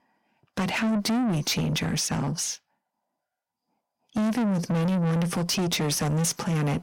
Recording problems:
distortion; heavy; 6 dB below the speech

